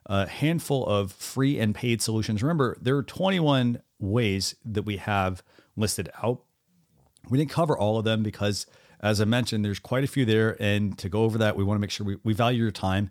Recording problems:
none

